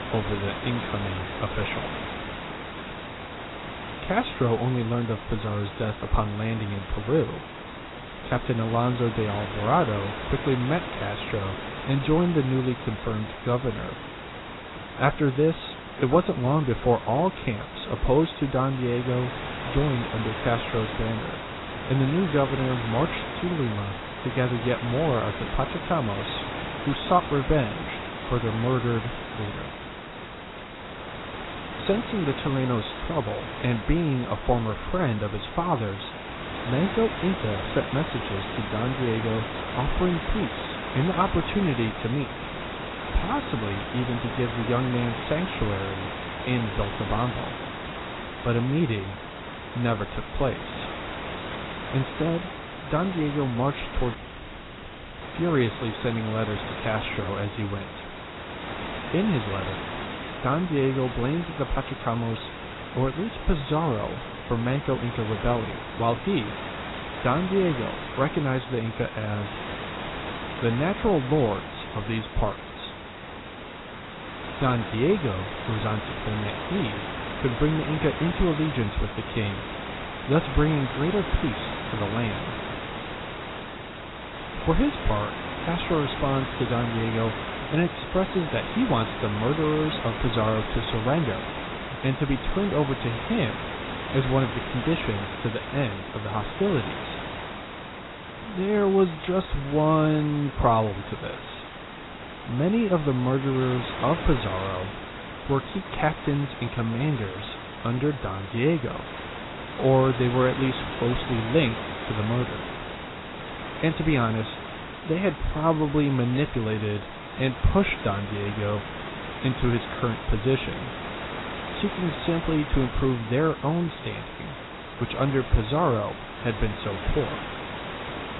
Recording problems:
garbled, watery; badly; nothing above 4 kHz
hiss; loud; throughout; 8 dB below the speech
audio cutting out; at 54 s for 1 s

